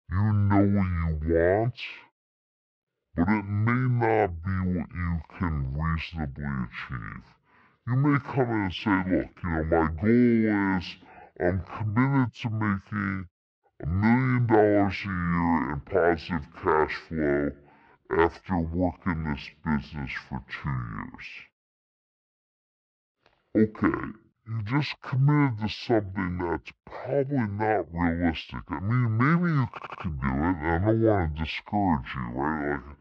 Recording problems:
wrong speed and pitch; too slow and too low; 0.6 times normal speed
muffled; very slightly; fading above 3 kHz
audio stuttering; at 30 s

